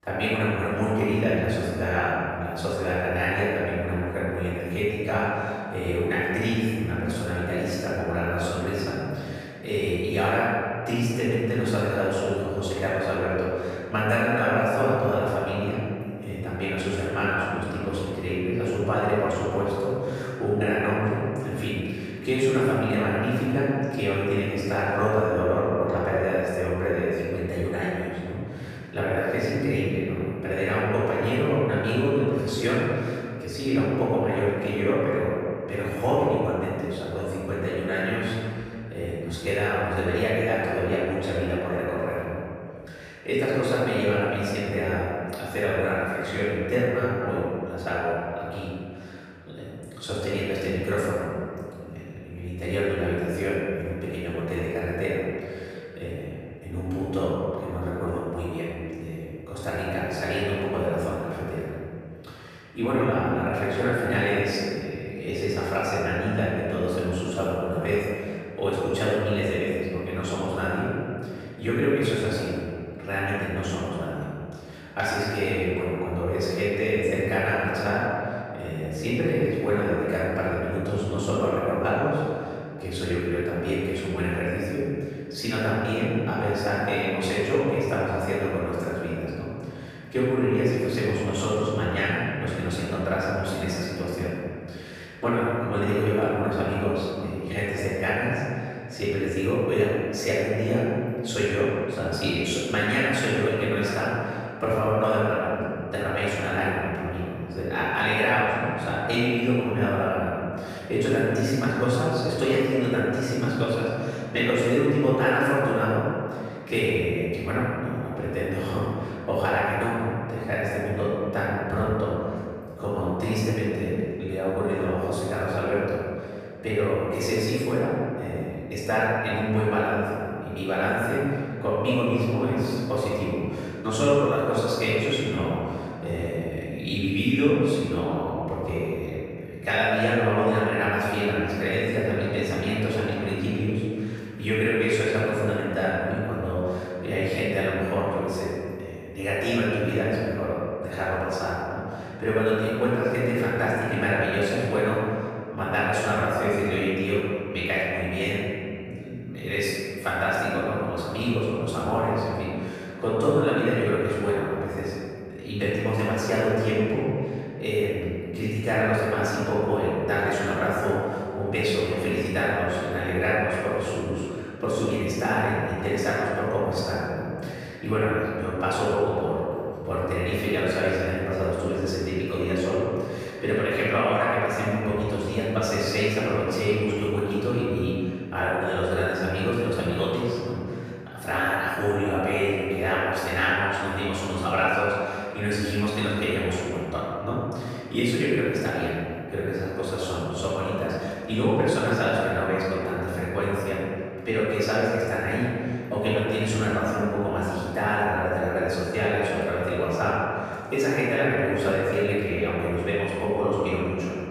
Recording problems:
room echo; strong; dies away in 2.1 s
off-mic speech; far

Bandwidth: 14.5 kHz